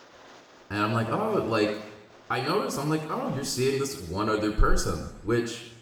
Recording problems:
room echo; noticeable; dies away in 0.8 s
off-mic speech; somewhat distant
rain or running water; faint; throughout; 25 dB below the speech

